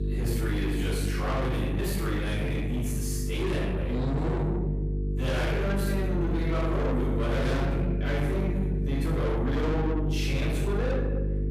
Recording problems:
distortion; heavy; 7 dB below the speech
room echo; strong; dies away in 1.1 s
off-mic speech; far
electrical hum; loud; throughout; 50 Hz, 8 dB below the speech

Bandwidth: 15 kHz